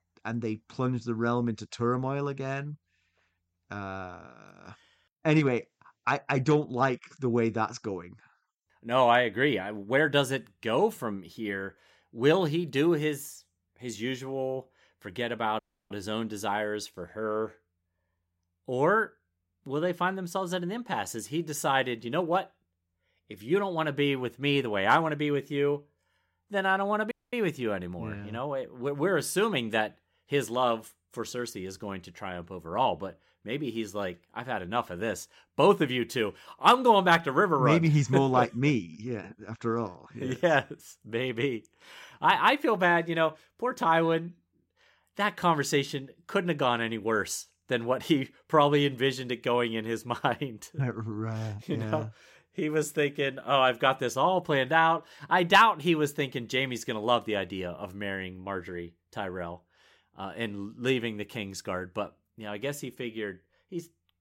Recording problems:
audio cutting out; at 16 s and at 27 s

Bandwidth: 16 kHz